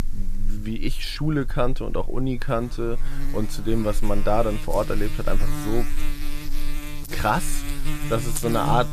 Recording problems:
electrical hum; loud; throughout; 50 Hz, 10 dB below the speech

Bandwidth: 14.5 kHz